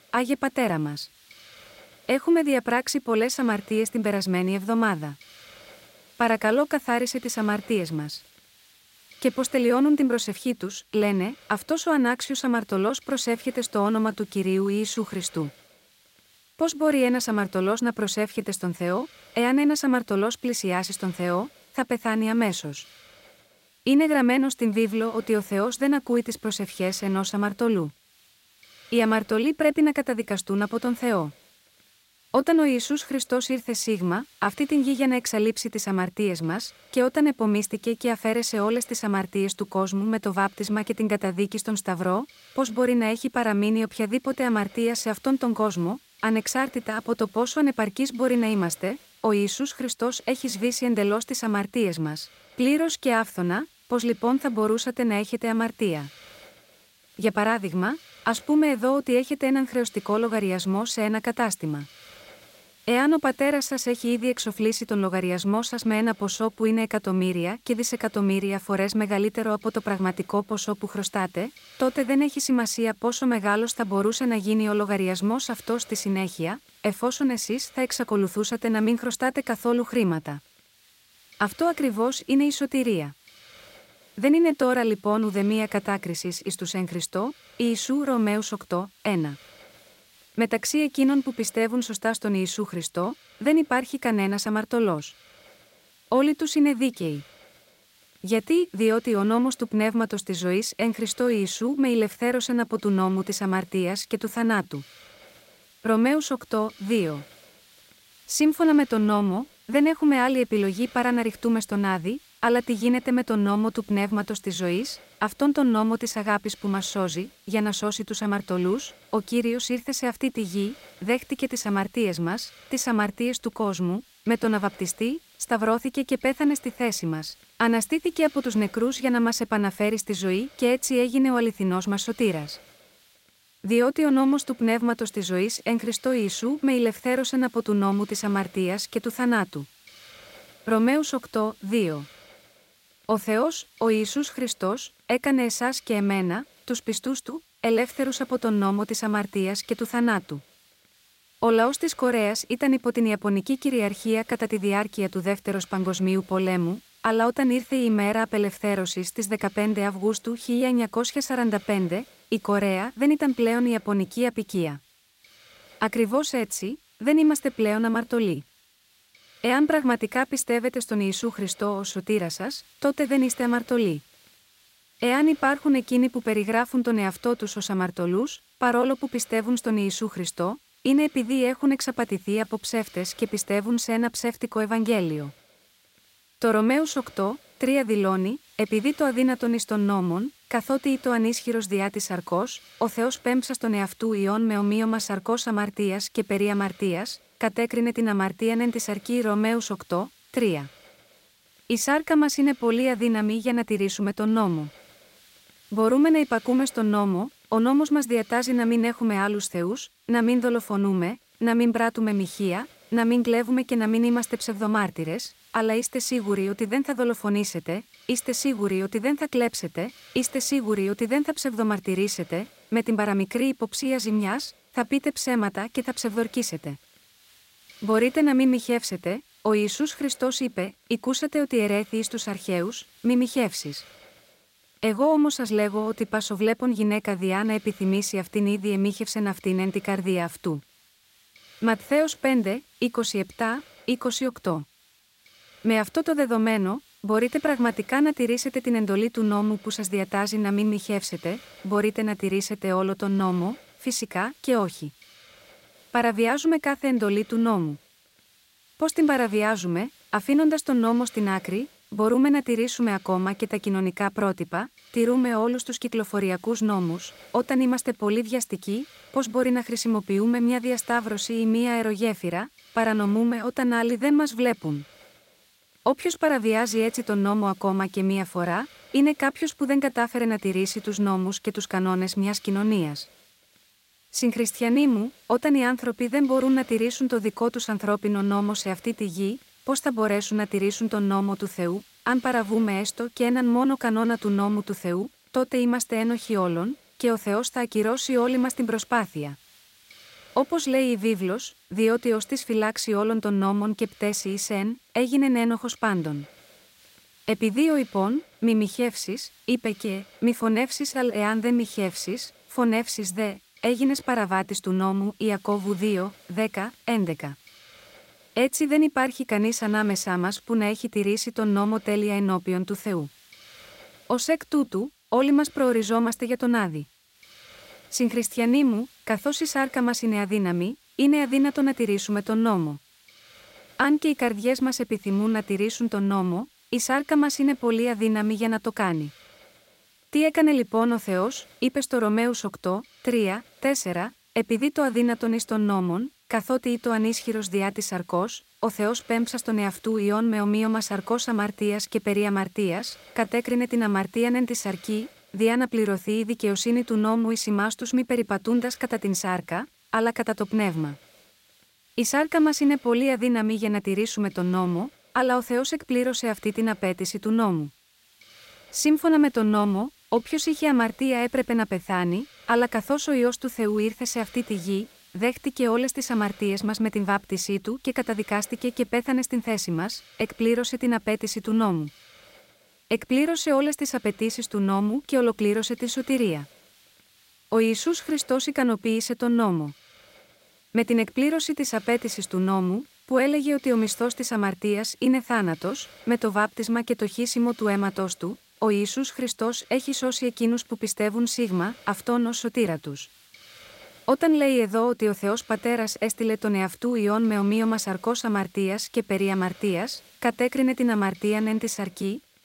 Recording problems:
hiss; faint; throughout; 25 dB below the speech

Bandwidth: 16 kHz